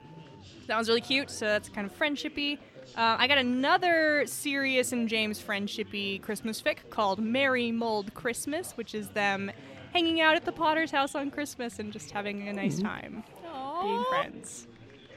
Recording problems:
chatter from many people; faint; throughout; 20 dB below the speech

